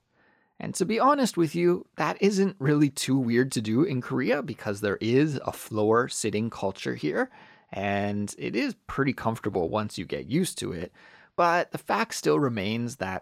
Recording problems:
none

